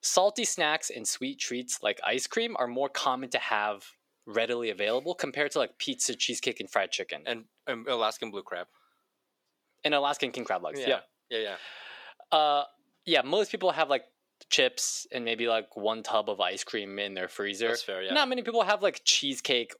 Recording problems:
thin; somewhat; fading below 450 Hz

